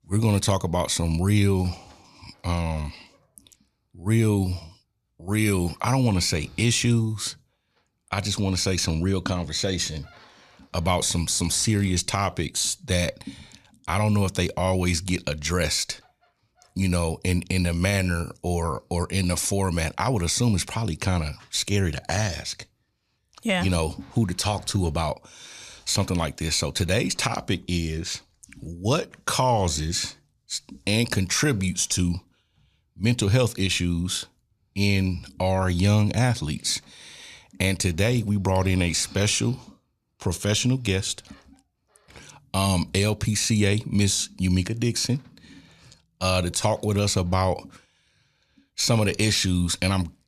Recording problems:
none

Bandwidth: 14.5 kHz